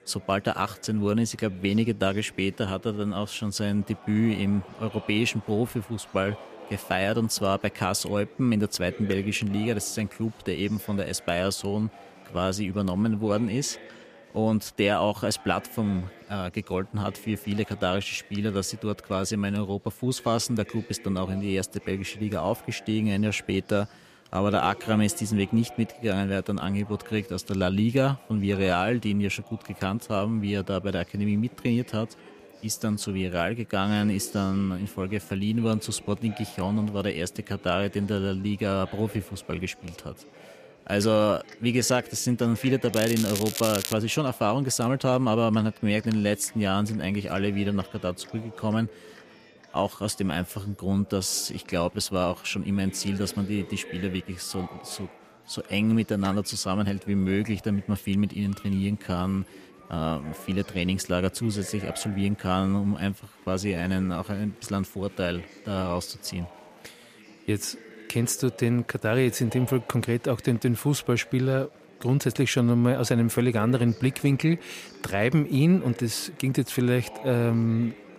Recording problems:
crackling; loud; from 43 to 44 s; 5 dB below the speech
chatter from many people; faint; throughout; 20 dB below the speech

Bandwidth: 14.5 kHz